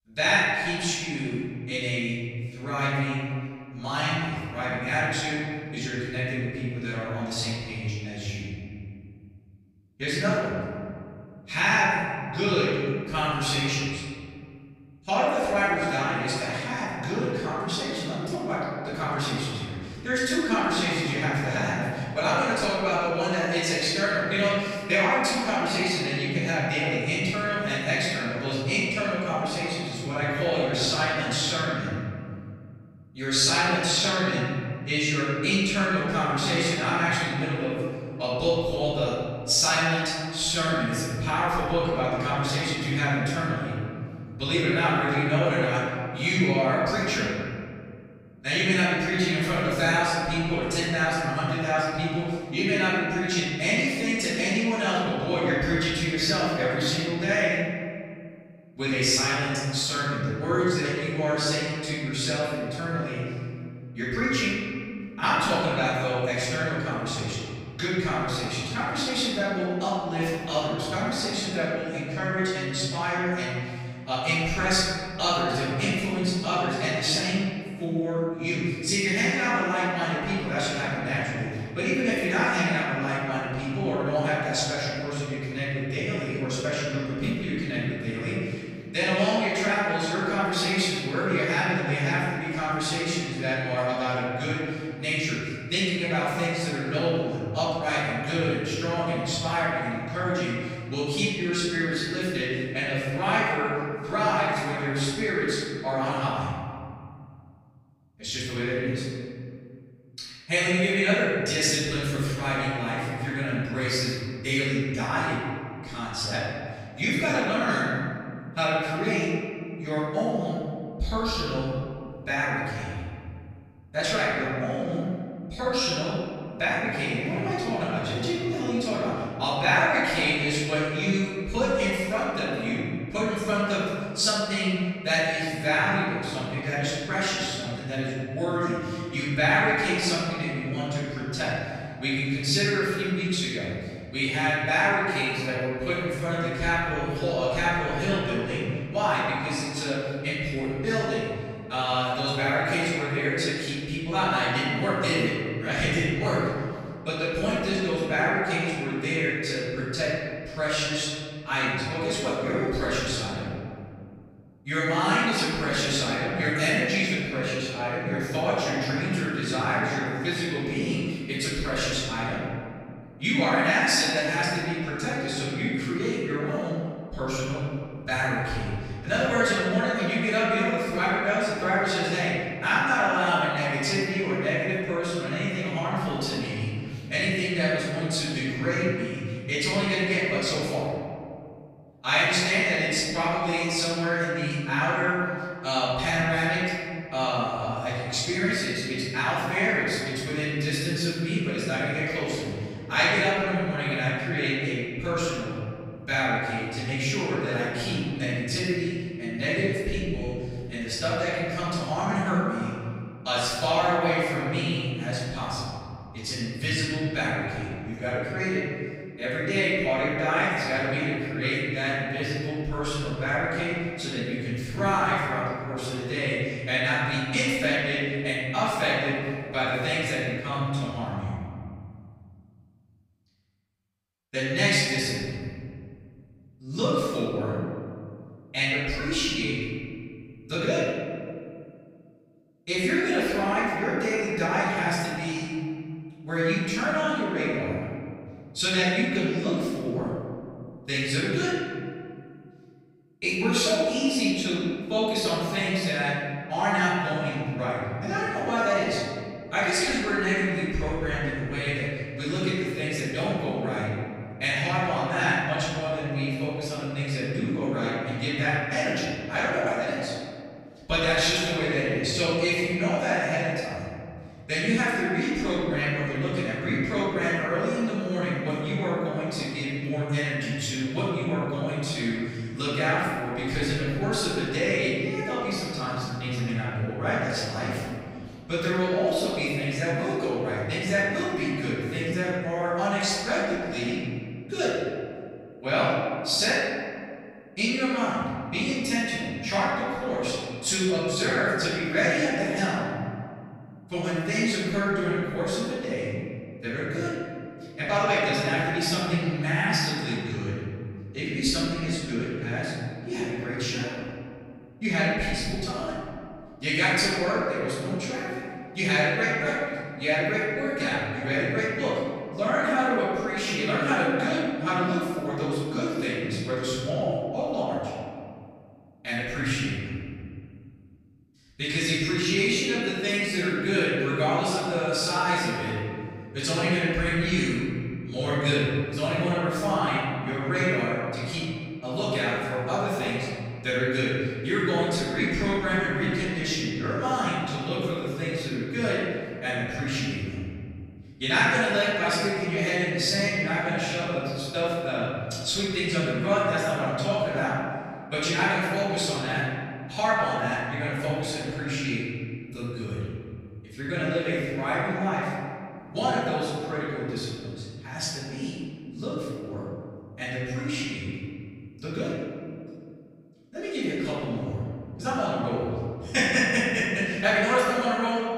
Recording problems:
room echo; strong; dies away in 2.2 s
off-mic speech; far

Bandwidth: 15.5 kHz